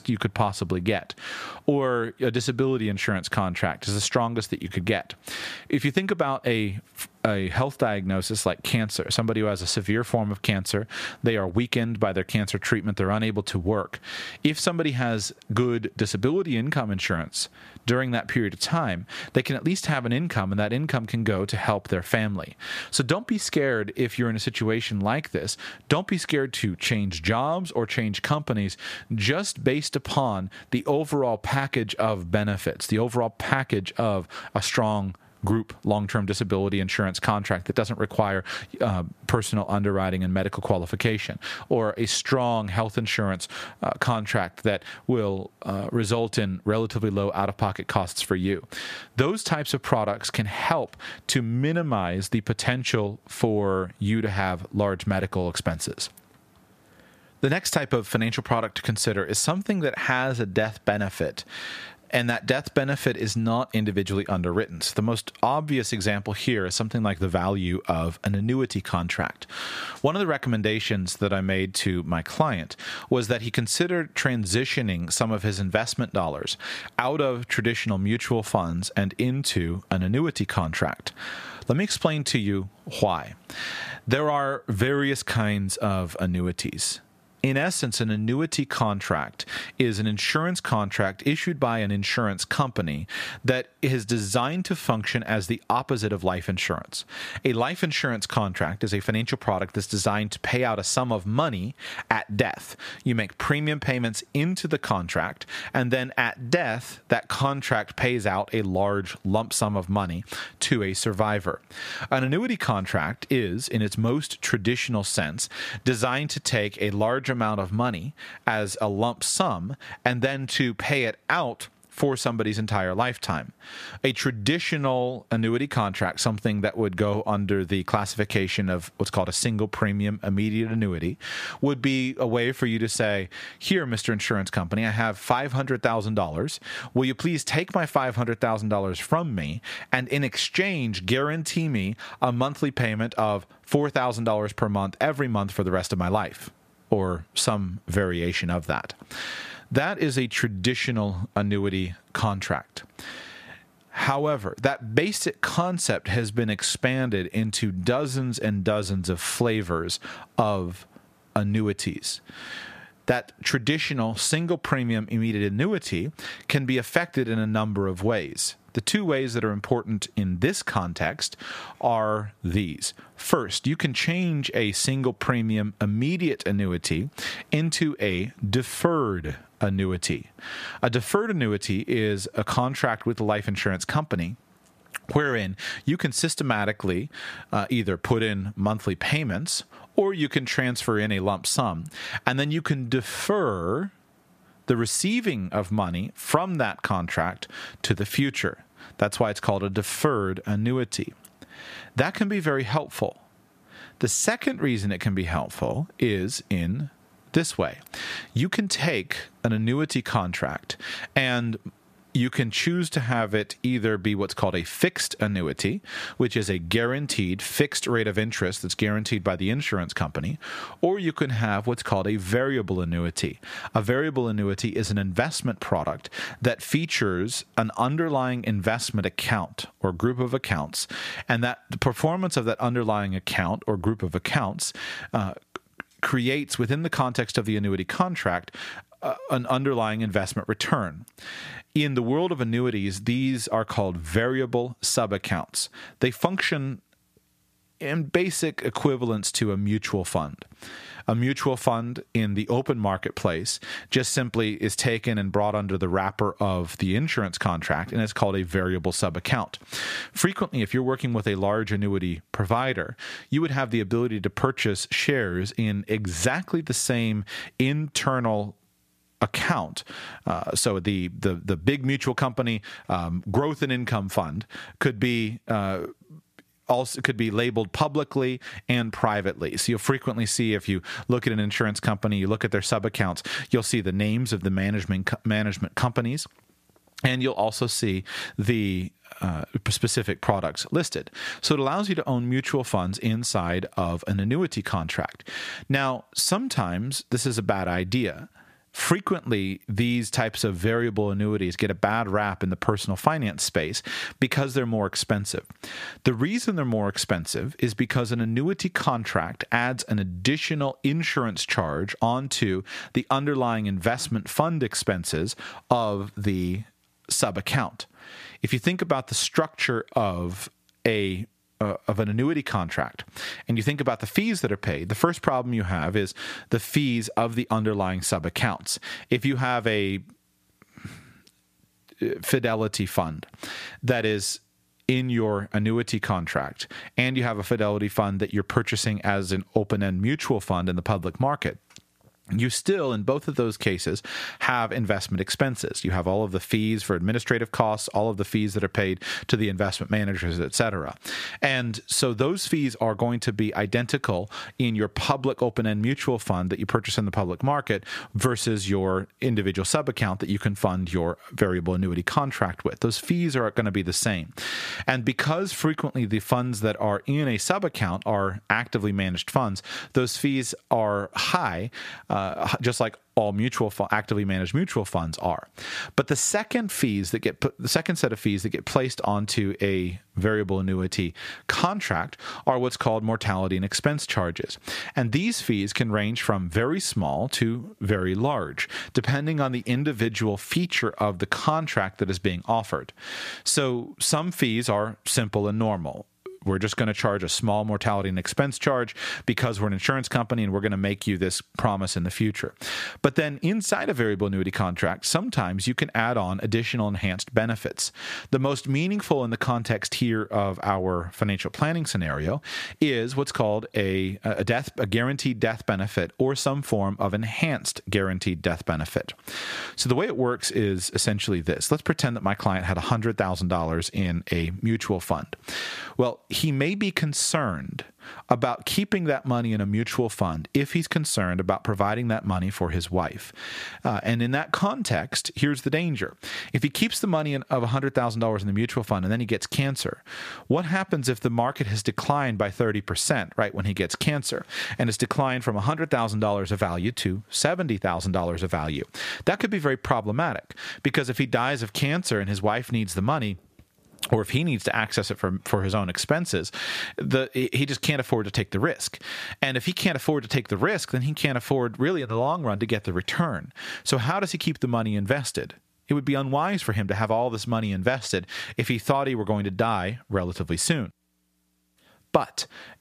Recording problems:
squashed, flat; somewhat

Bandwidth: 14.5 kHz